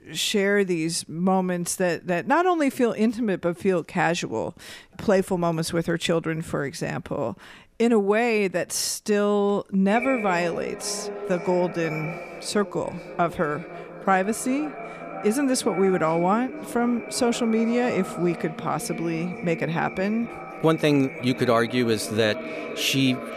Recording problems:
echo of what is said; strong; from 10 s on; 510 ms later, 10 dB below the speech

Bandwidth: 14.5 kHz